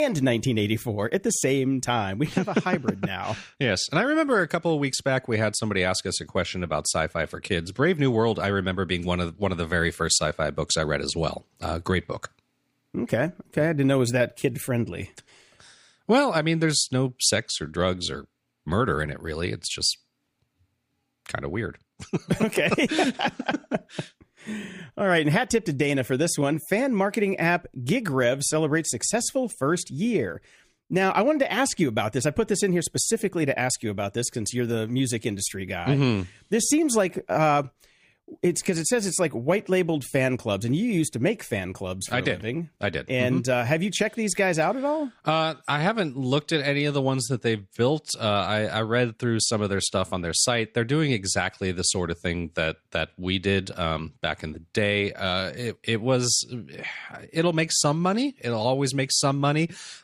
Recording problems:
abrupt cut into speech; at the start

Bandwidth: 15 kHz